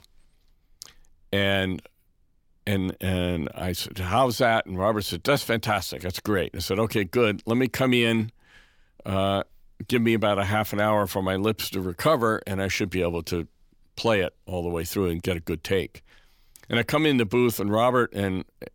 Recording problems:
none

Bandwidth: 18 kHz